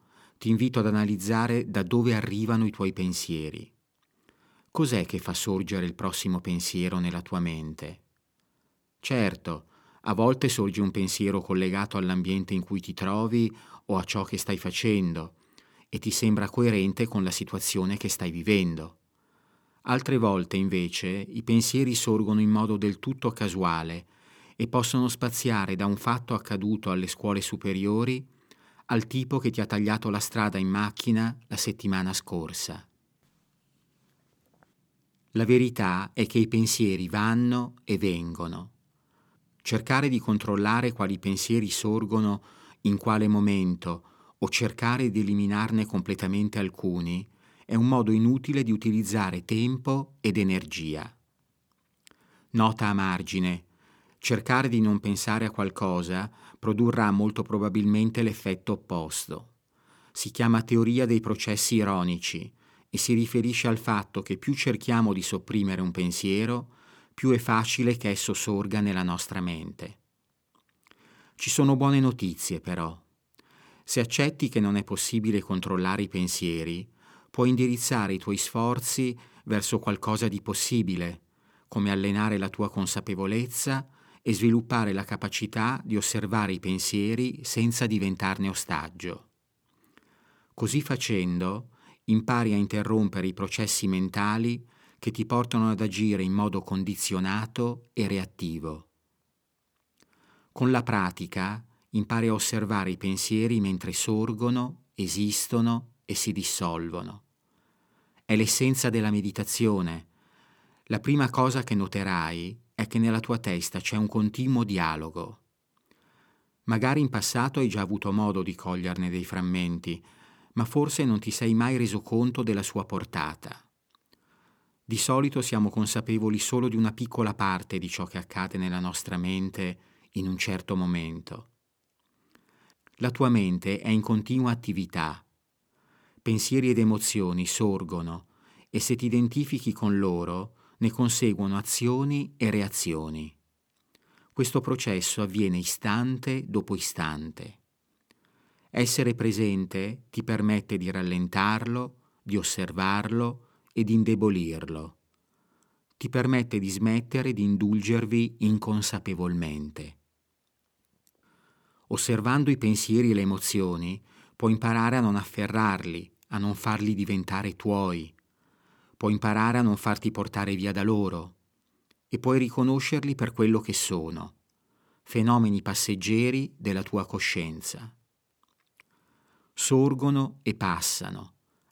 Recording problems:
none

